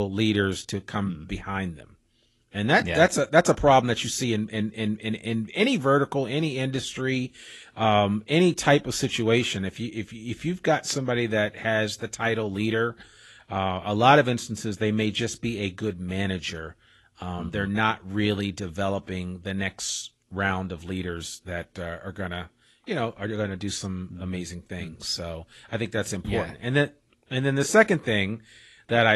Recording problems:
garbled, watery; slightly; nothing above 11.5 kHz
abrupt cut into speech; at the start and the end

